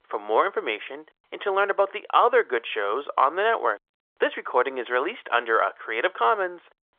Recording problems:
phone-call audio; nothing above 3.5 kHz

